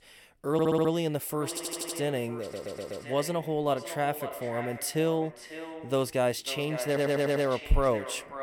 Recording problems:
echo of what is said; strong; throughout; 550 ms later, 10 dB below the speech
audio stuttering; 4 times, first at 0.5 s

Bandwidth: 17.5 kHz